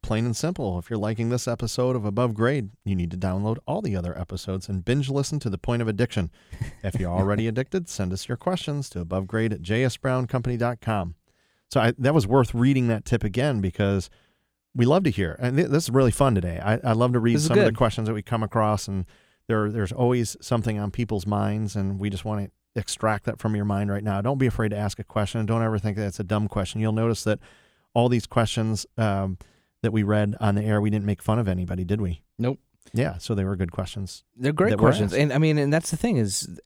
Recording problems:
none

